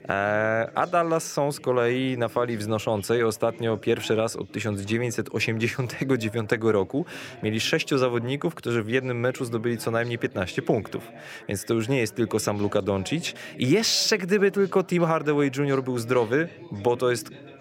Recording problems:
background chatter; noticeable; throughout; 3 voices, 20 dB below the speech

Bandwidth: 16 kHz